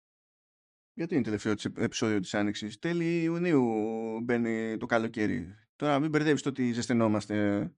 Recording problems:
none

